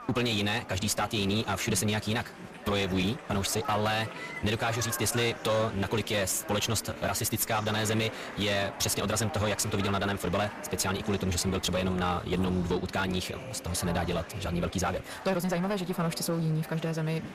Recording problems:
wrong speed, natural pitch; too fast; 1.5 times normal speed
distortion; slight; 11% of the sound clipped
murmuring crowd; noticeable; throughout; 15 dB below the speech

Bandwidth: 14.5 kHz